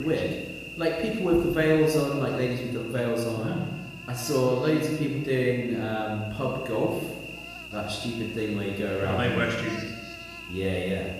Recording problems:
room echo; noticeable; dies away in 1 s
off-mic speech; somewhat distant
electrical hum; loud; throughout; 60 Hz, 10 dB below the speech
abrupt cut into speech; at the start

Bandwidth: 15 kHz